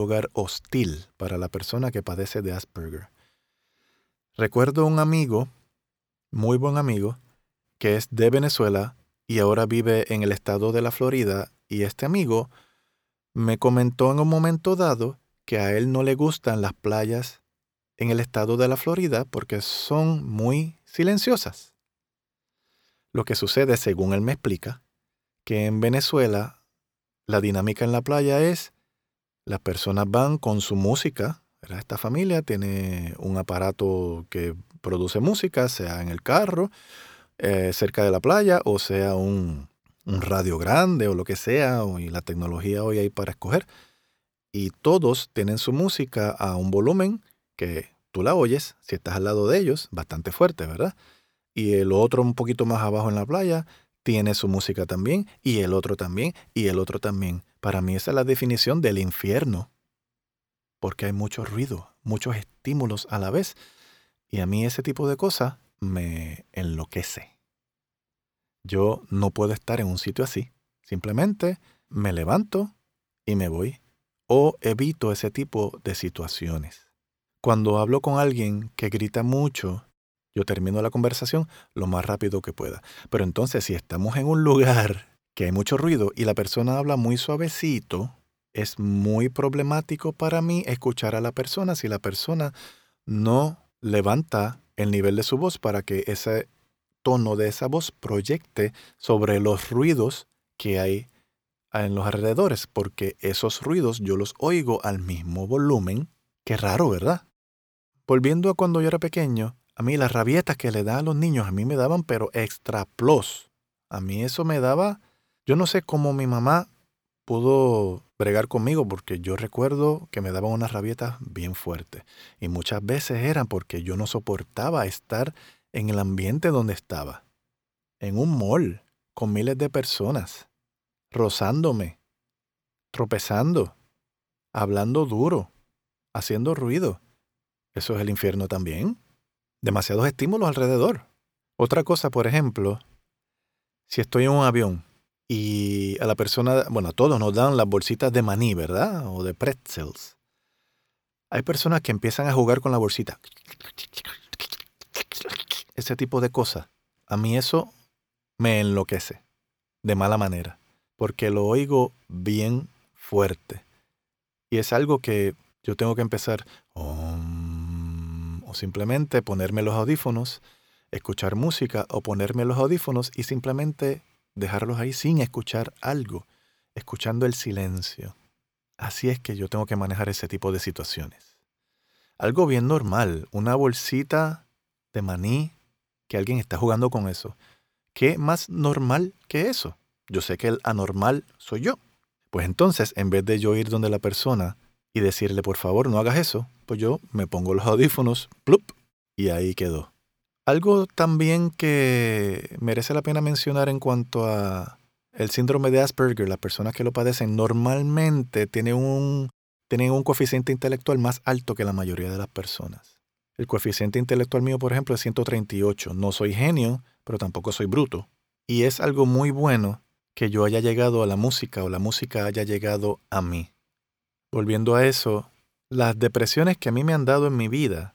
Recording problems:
abrupt cut into speech; at the start

